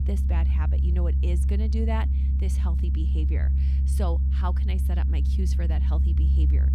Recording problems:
low rumble; loud; throughout; 3 dB below the speech

